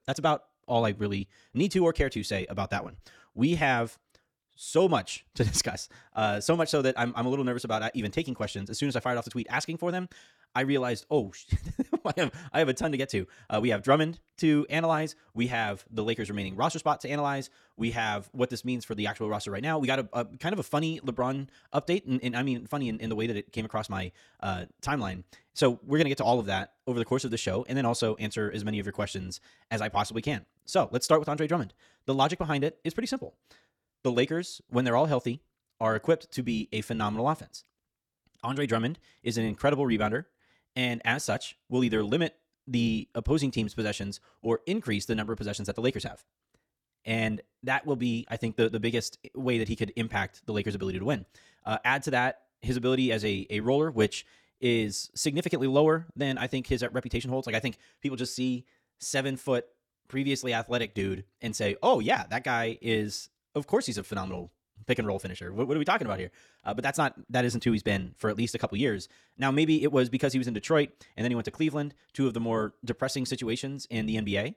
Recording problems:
wrong speed, natural pitch; too fast; 1.6 times normal speed

